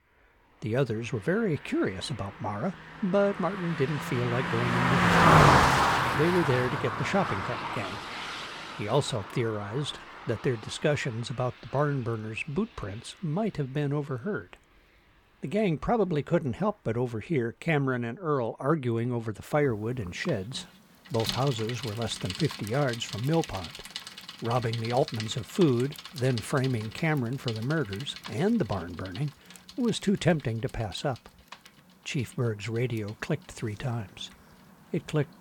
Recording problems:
traffic noise; very loud; throughout; 1 dB above the speech

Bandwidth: 18.5 kHz